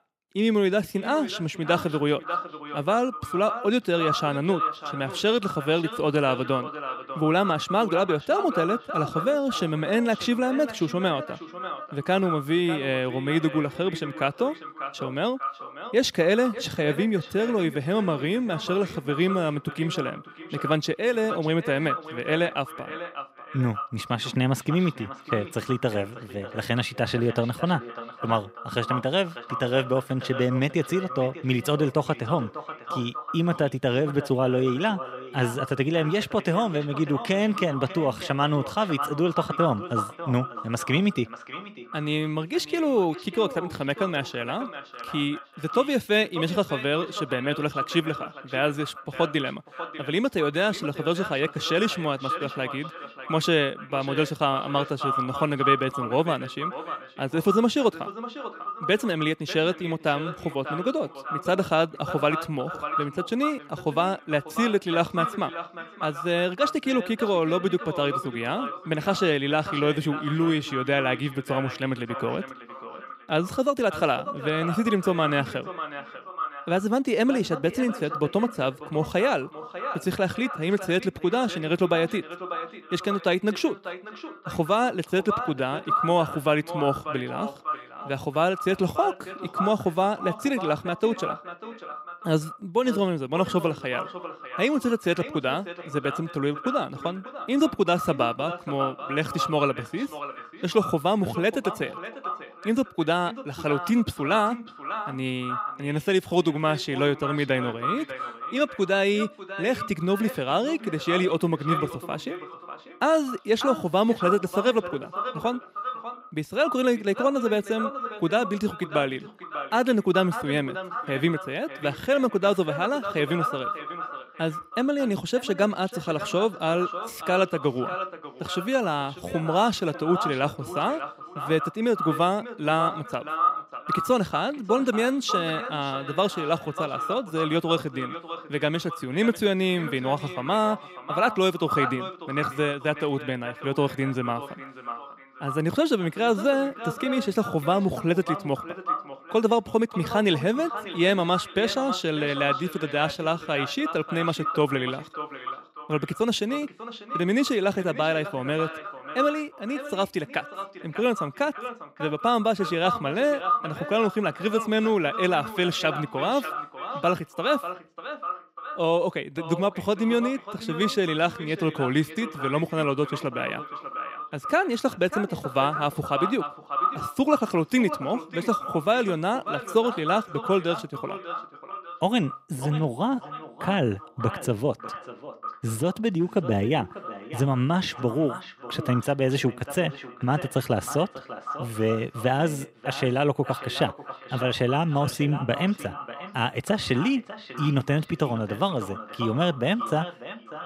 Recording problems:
echo of what is said; strong; throughout; 590 ms later, 9 dB below the speech

